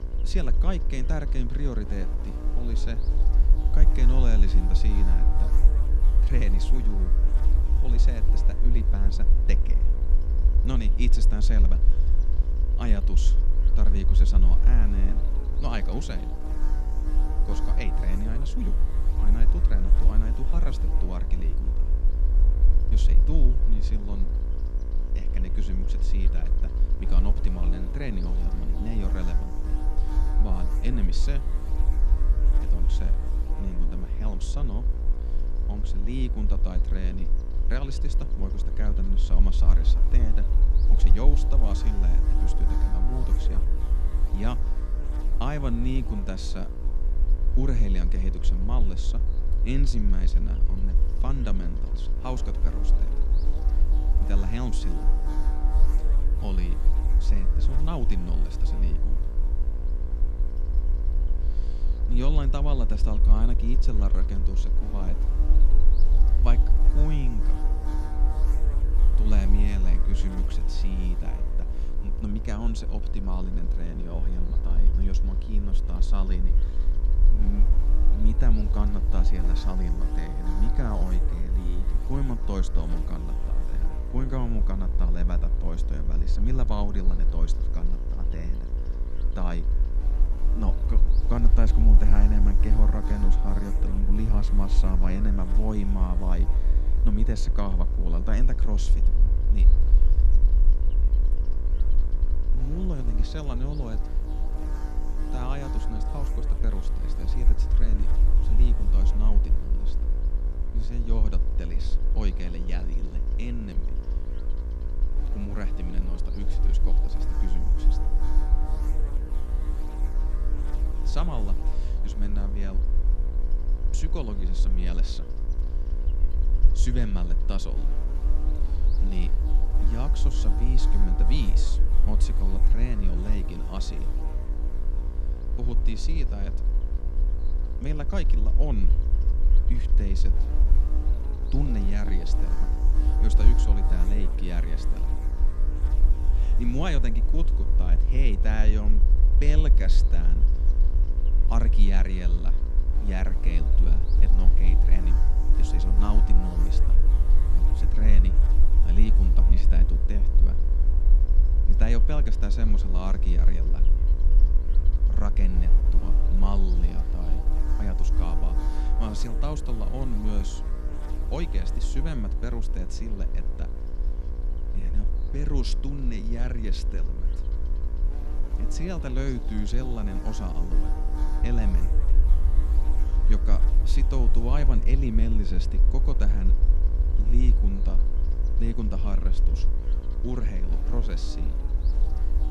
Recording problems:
electrical hum; loud; throughout; 60 Hz, 6 dB below the speech
low rumble; noticeable; throughout; 10 dB below the speech

